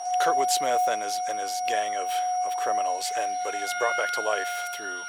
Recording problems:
thin; very; fading below 600 Hz
background music; very loud; throughout; 3 dB above the speech
high-pitched whine; loud; throughout; 5.5 kHz, 9 dB below the speech
rain or running water; faint; throughout; 20 dB below the speech

